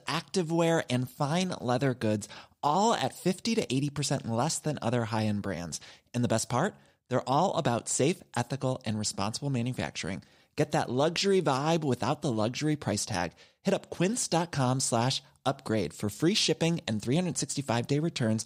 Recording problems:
none

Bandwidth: 15.5 kHz